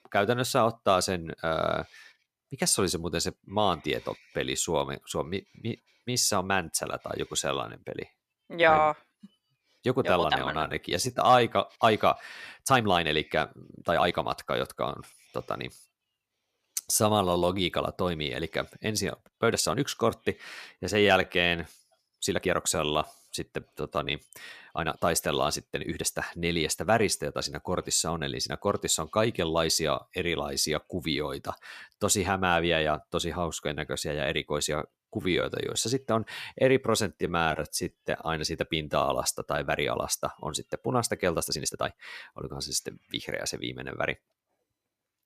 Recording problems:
uneven, jittery; strongly; from 8.5 to 42 s

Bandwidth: 14.5 kHz